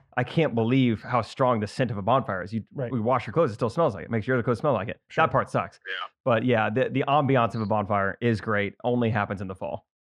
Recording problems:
muffled; slightly; fading above 2.5 kHz

